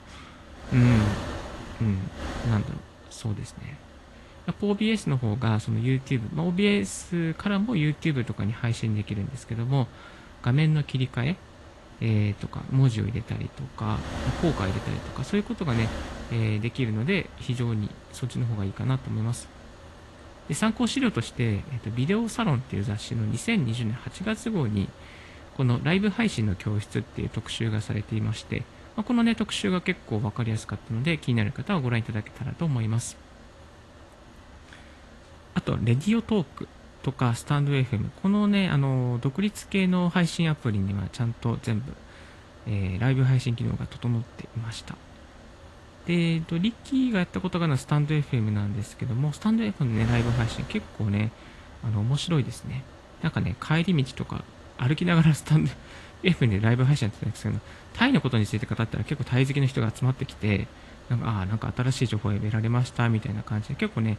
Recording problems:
garbled, watery; slightly; nothing above 11.5 kHz
wind noise on the microphone; occasional gusts; 15 dB below the speech

